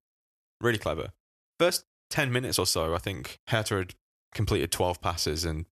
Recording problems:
none

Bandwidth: 13.5 kHz